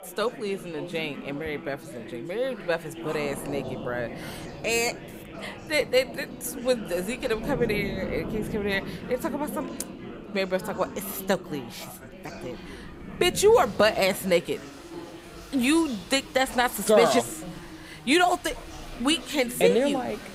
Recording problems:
rain or running water; noticeable; throughout; 15 dB below the speech
background chatter; noticeable; throughout; 4 voices, 15 dB below the speech

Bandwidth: 15.5 kHz